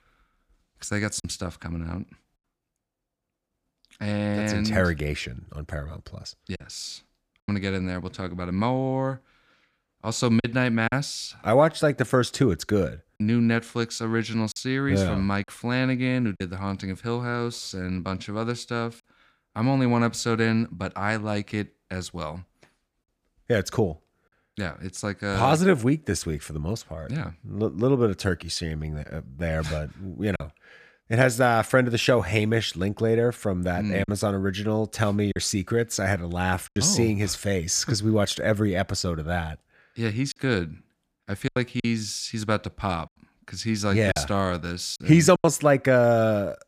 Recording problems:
choppy; occasionally; 2% of the speech affected

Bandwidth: 15 kHz